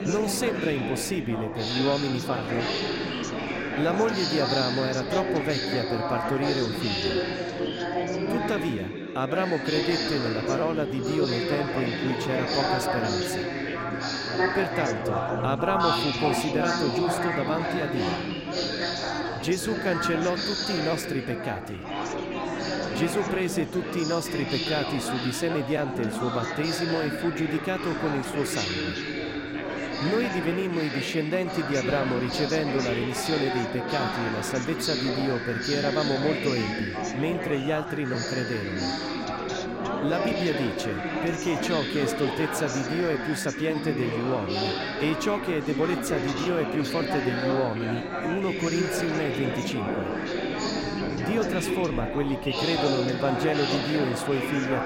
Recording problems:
chatter from many people; very loud; throughout; as loud as the speech

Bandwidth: 16 kHz